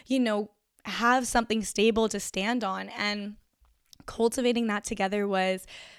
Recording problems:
none

